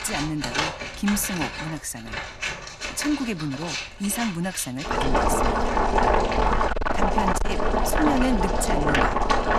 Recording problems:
distortion; slight; 10 dB below the speech
household noises; very loud; throughout; 3 dB above the speech

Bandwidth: 13.5 kHz